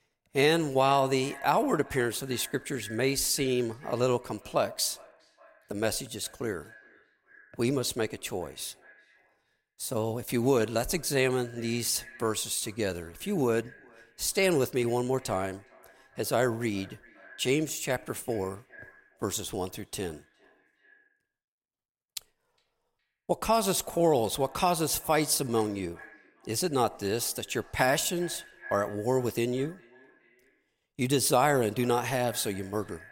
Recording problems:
echo of what is said; faint; throughout; 410 ms later, 25 dB below the speech

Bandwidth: 16.5 kHz